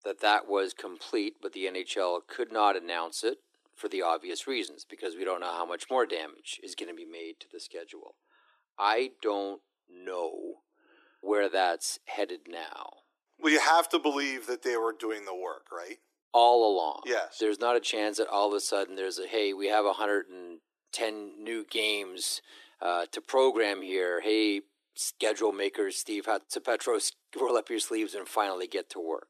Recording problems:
thin; very; fading below 300 Hz

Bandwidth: 13.5 kHz